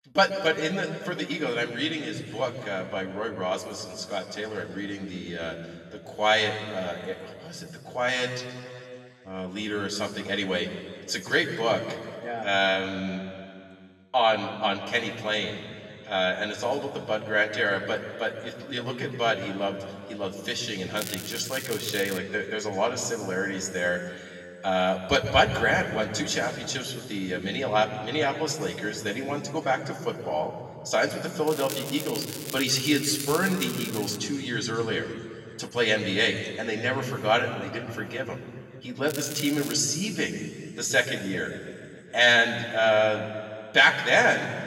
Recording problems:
off-mic speech; far
room echo; noticeable; dies away in 2.2 s
crackling; loud; from 21 to 22 s, from 31 to 34 s and at 39 s; 10 dB below the speech

